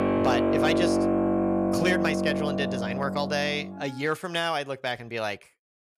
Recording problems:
background music; very loud; until 3.5 s; 3 dB above the speech

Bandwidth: 14.5 kHz